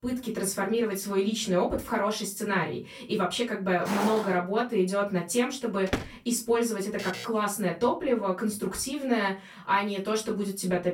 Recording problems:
off-mic speech; far
room echo; very slight; dies away in 0.2 s
footsteps; noticeable; at 4 s; peak 3 dB below the speech
door banging; noticeable; at 6 s; peak 5 dB below the speech
alarm; noticeable; at 7 s; peak 10 dB below the speech

